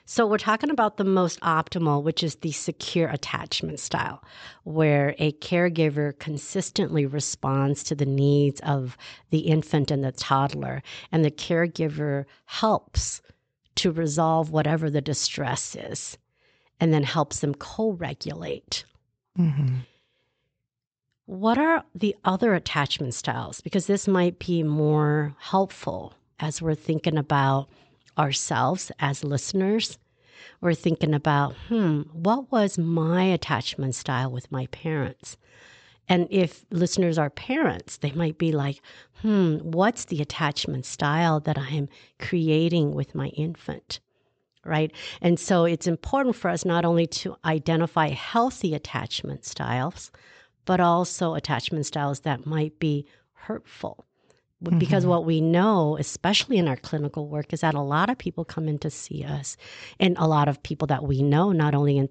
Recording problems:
high frequencies cut off; noticeable; nothing above 8 kHz

